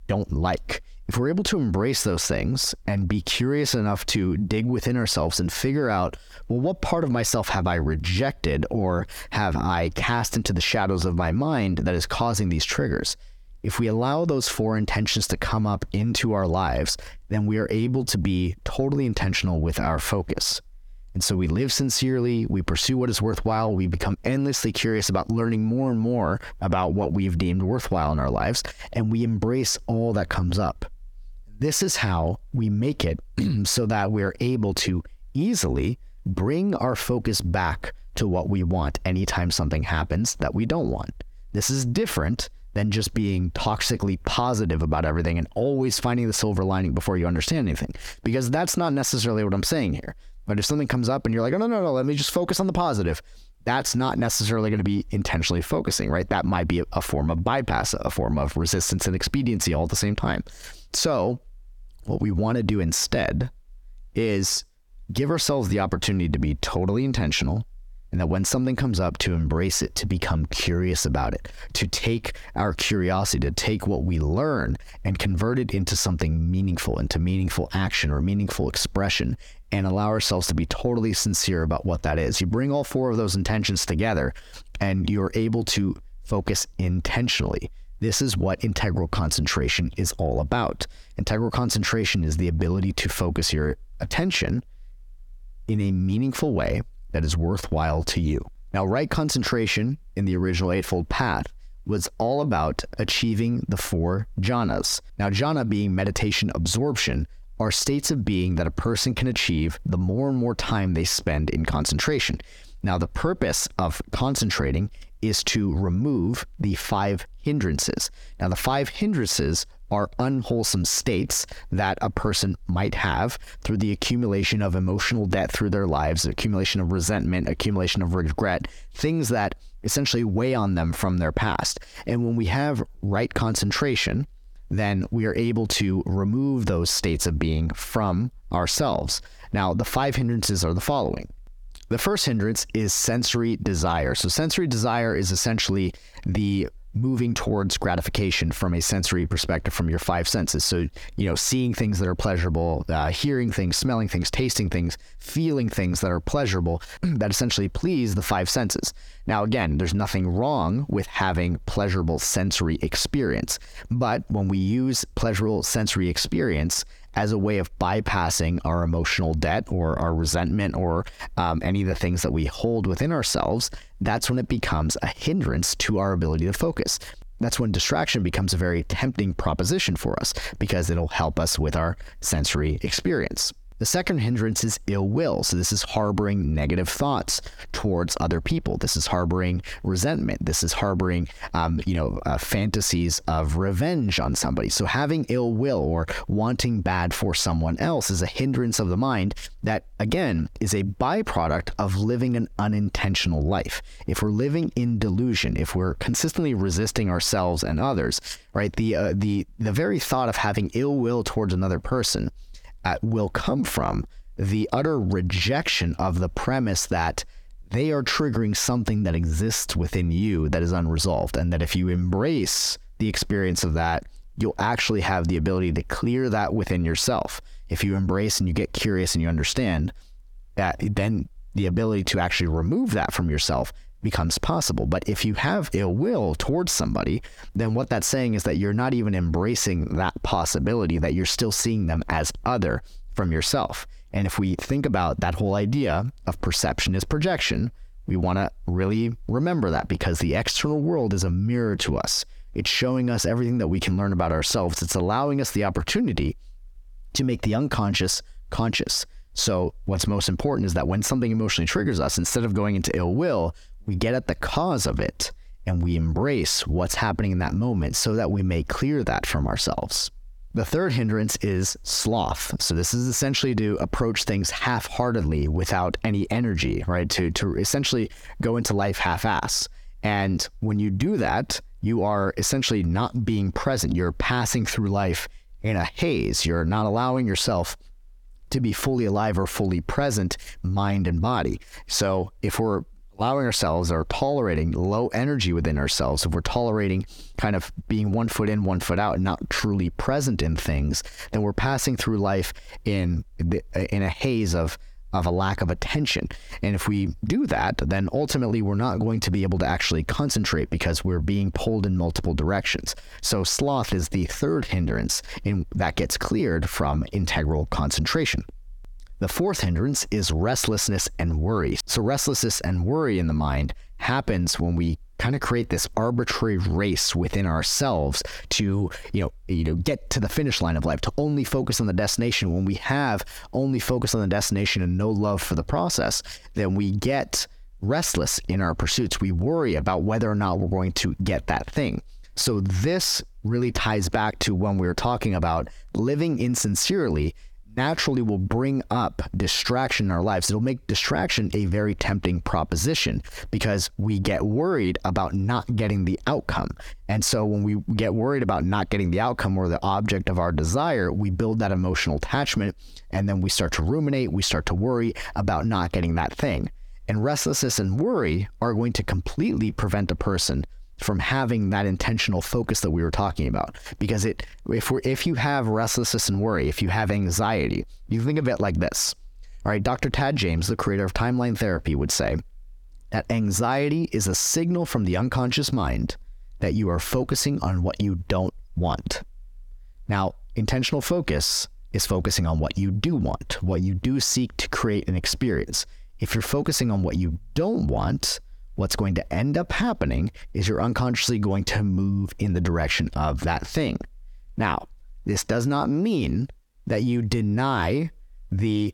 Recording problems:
squashed, flat; heavily

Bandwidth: 18 kHz